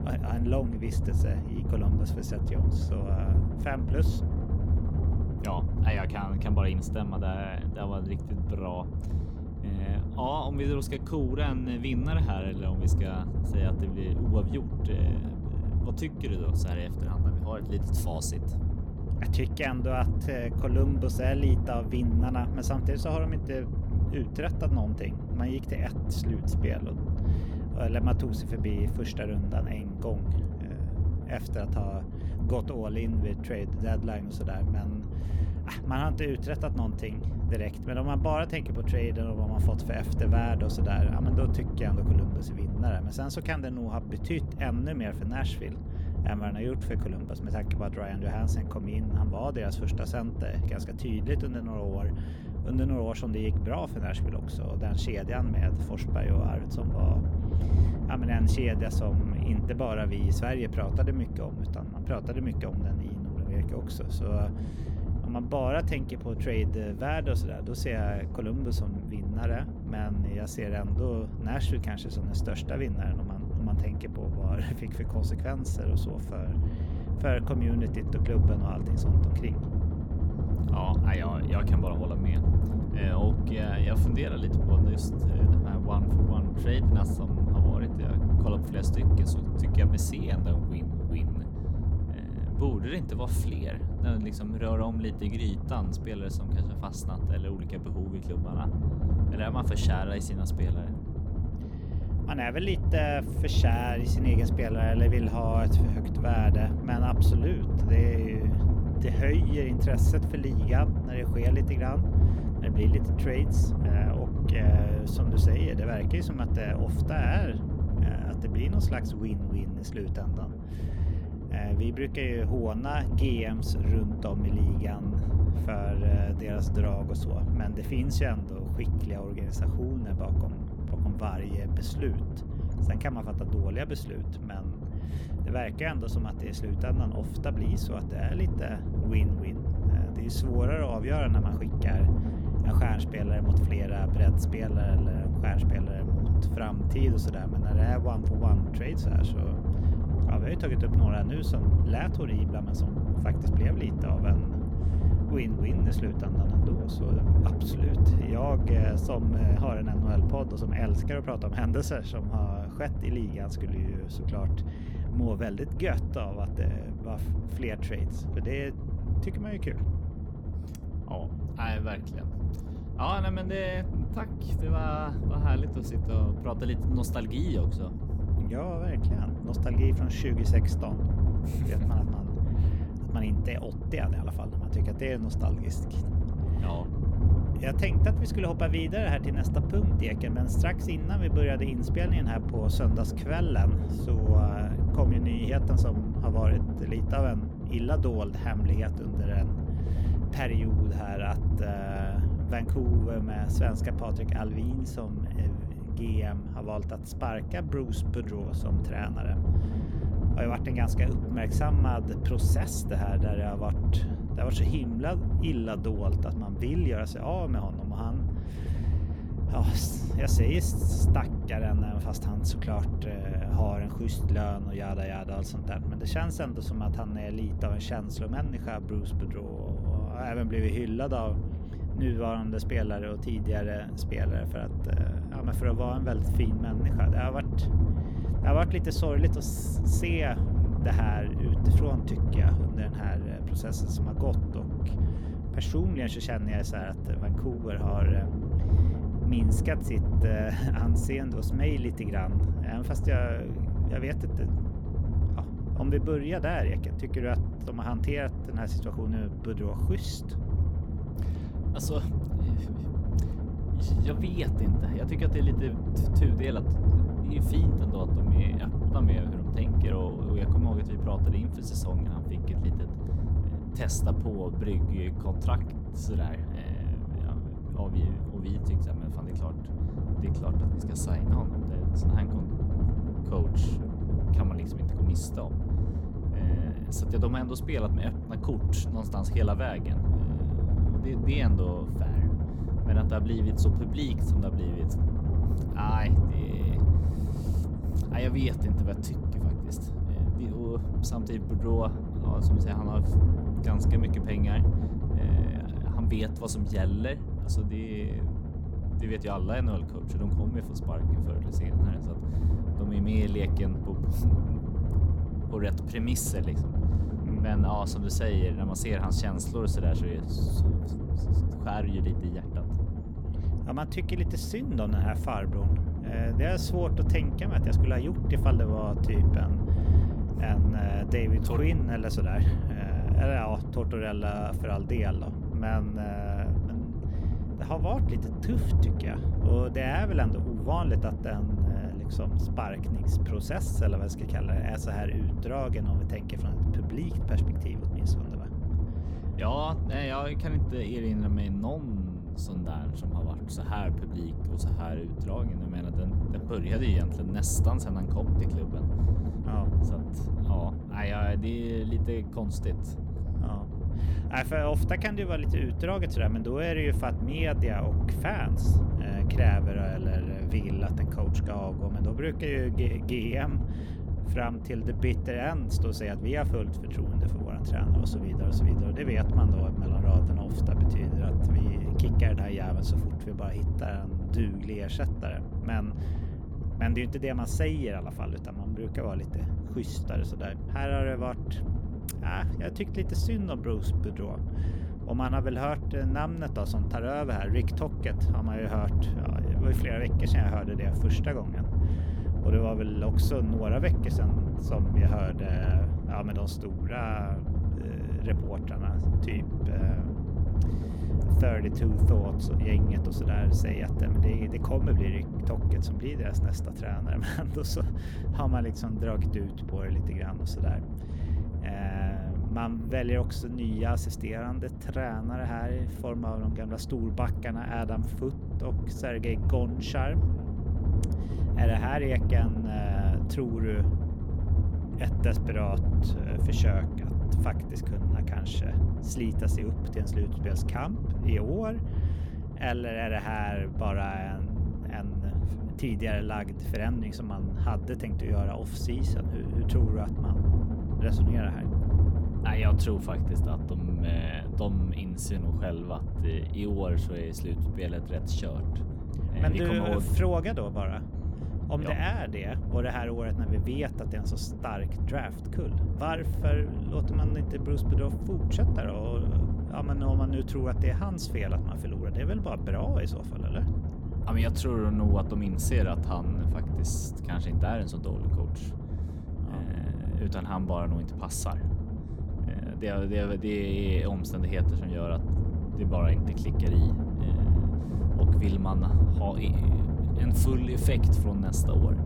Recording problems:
low rumble; loud; throughout; 4 dB below the speech

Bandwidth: 18 kHz